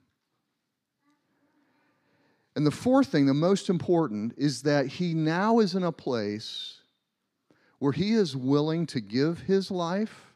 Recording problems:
none

